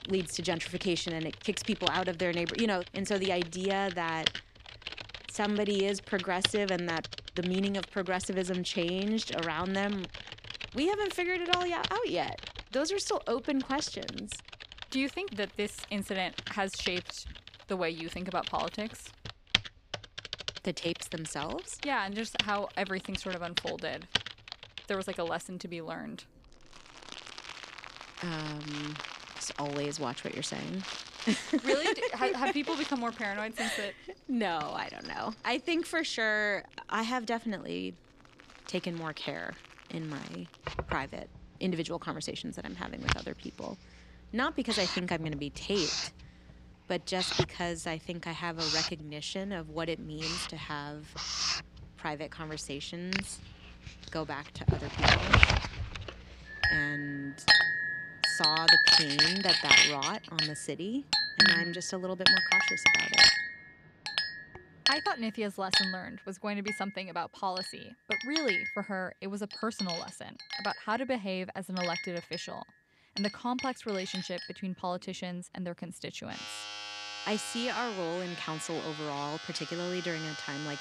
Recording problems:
household noises; very loud; throughout; 5 dB above the speech

